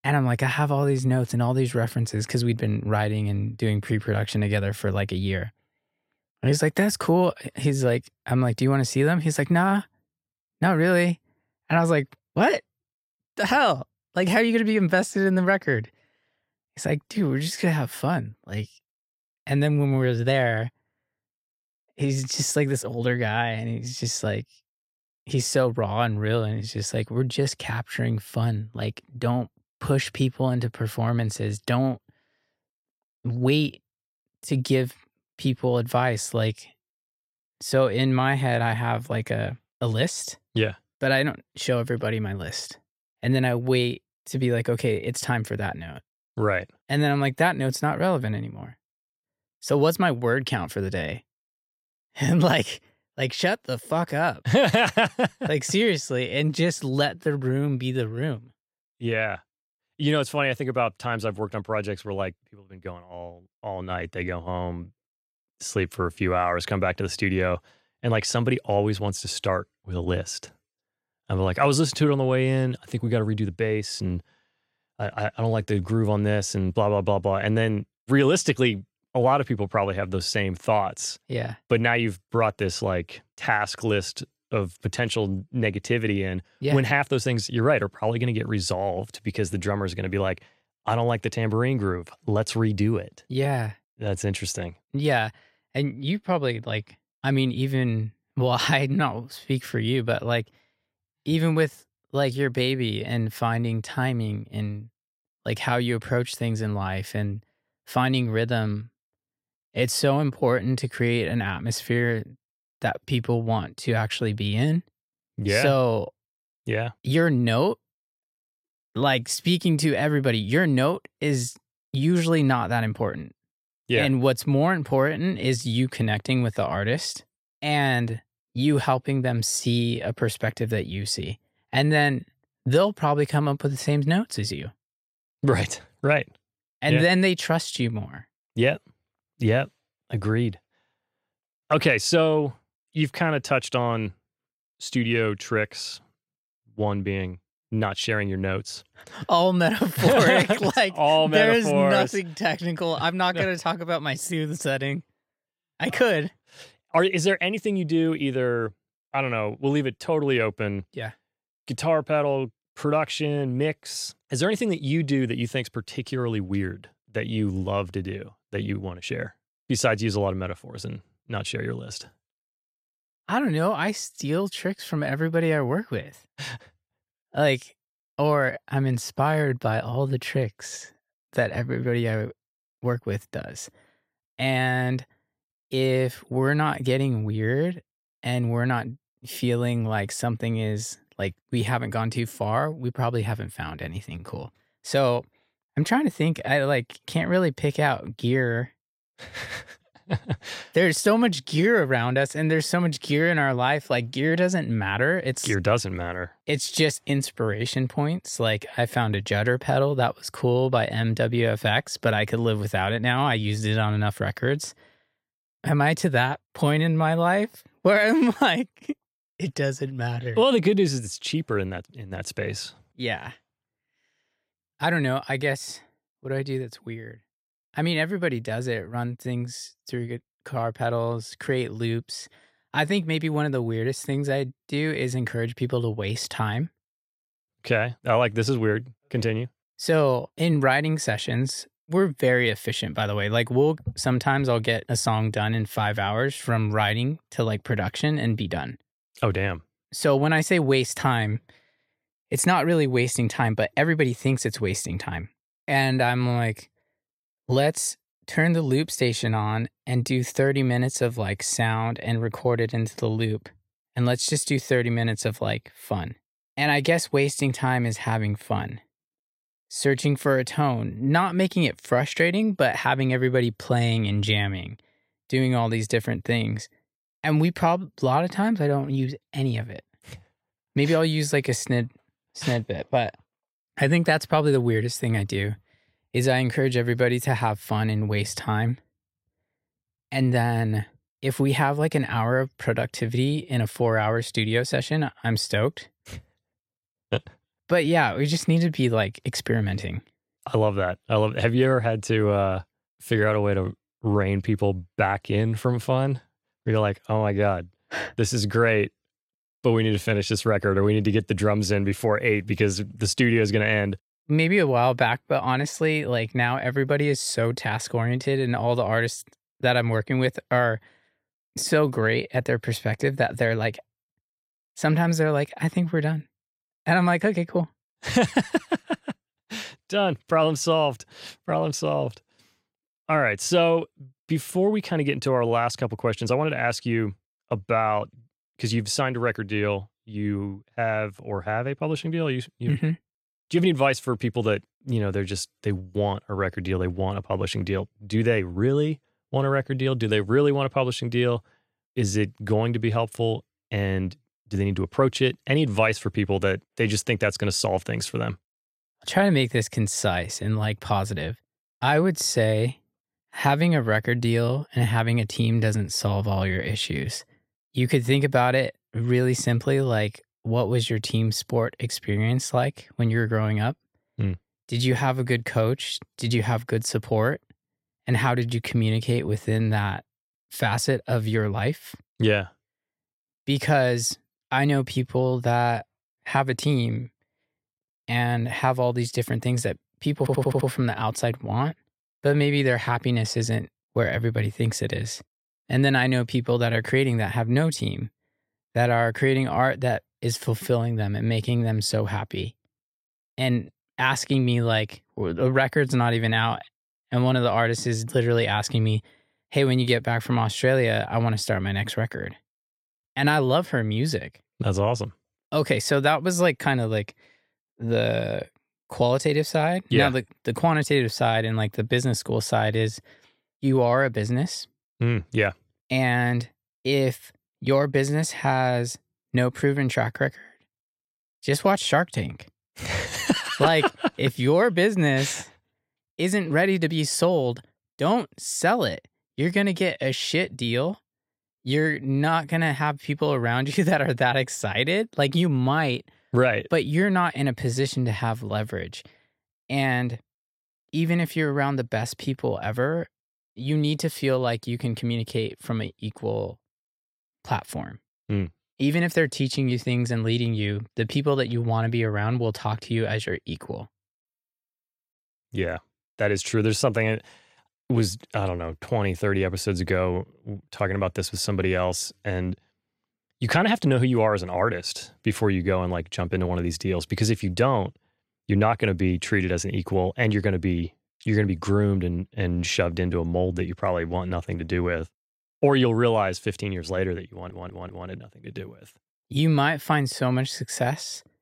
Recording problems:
audio stuttering; at 6:30 and at 8:07

